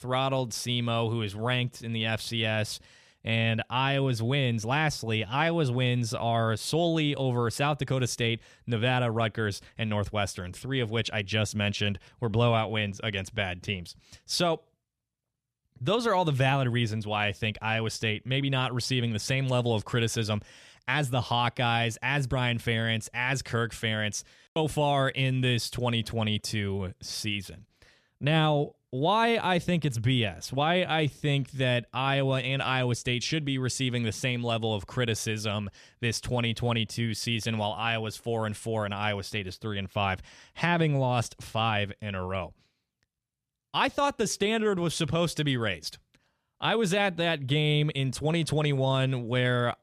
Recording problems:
none

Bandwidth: 14 kHz